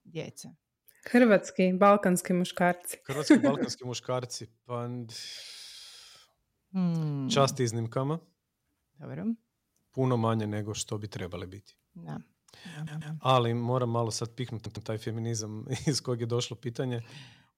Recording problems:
audio stuttering; at 13 s and at 15 s

